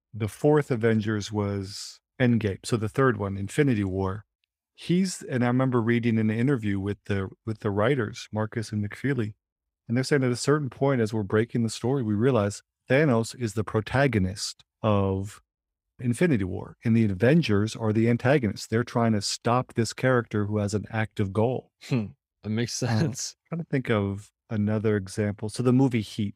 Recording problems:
none

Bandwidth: 15.5 kHz